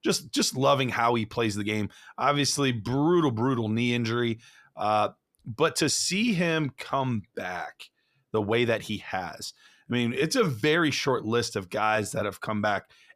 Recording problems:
uneven, jittery; strongly; from 2 to 12 s

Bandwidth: 14.5 kHz